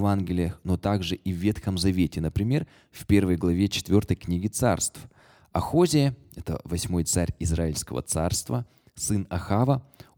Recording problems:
abrupt cut into speech; at the start

